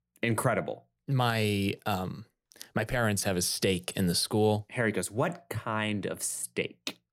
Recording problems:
none

